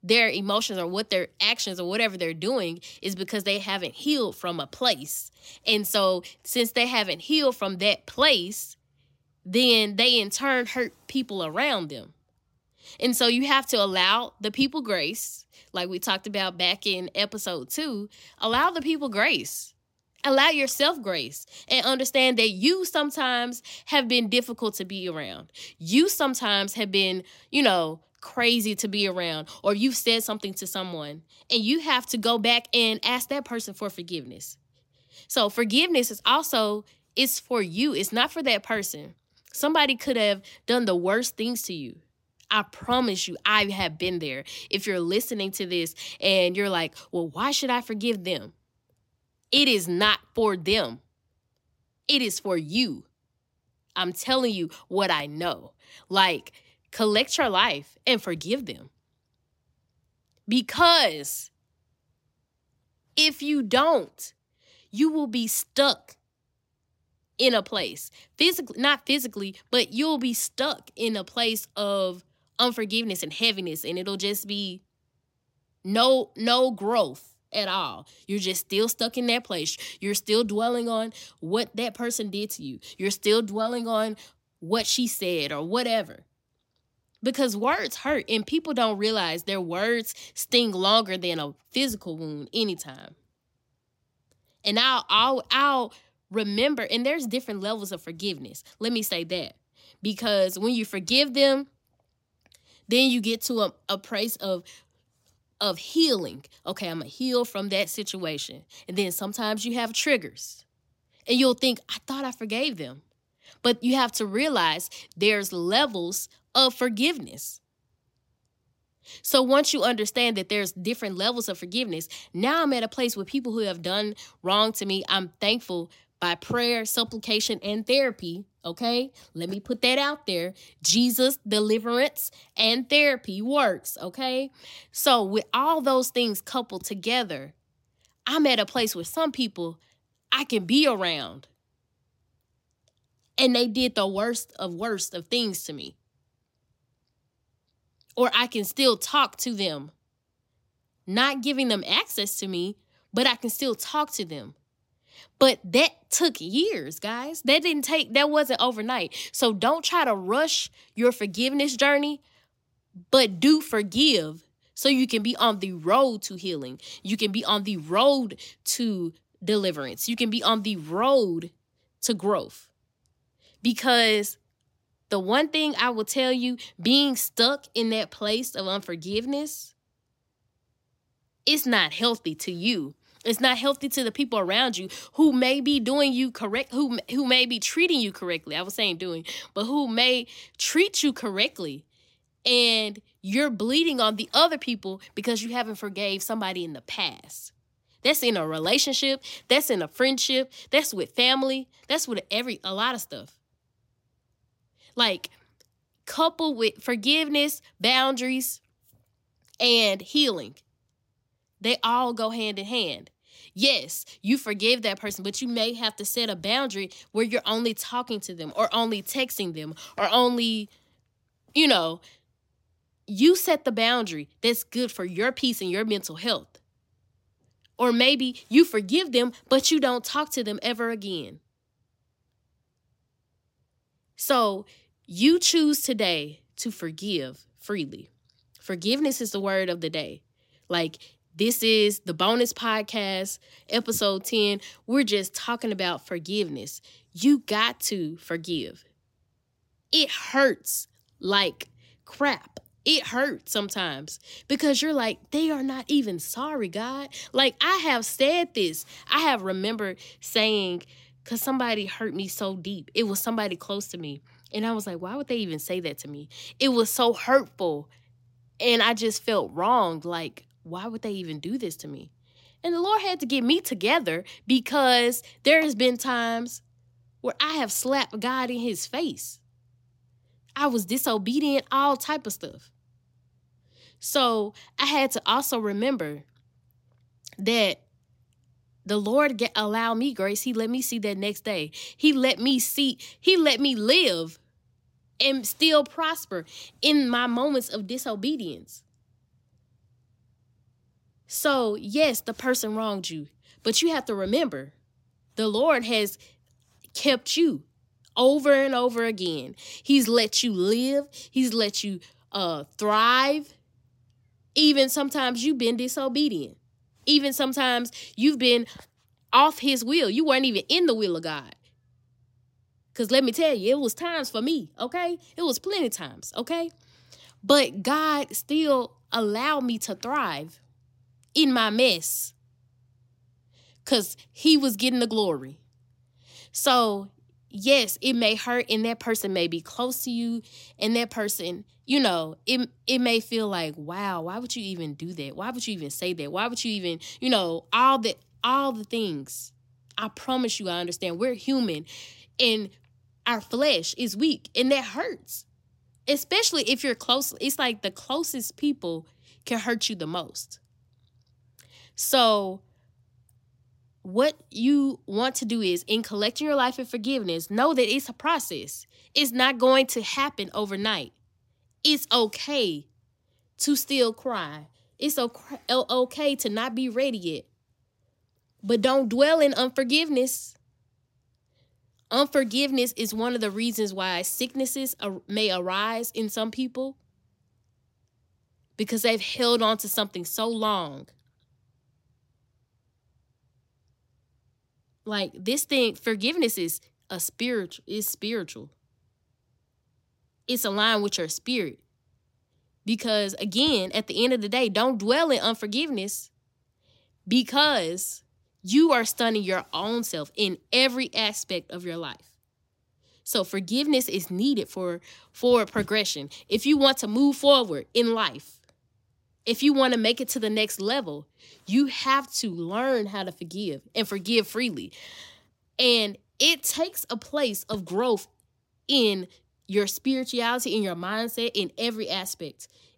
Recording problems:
none

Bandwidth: 16 kHz